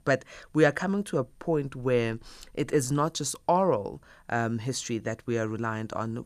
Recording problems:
none

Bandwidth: 14.5 kHz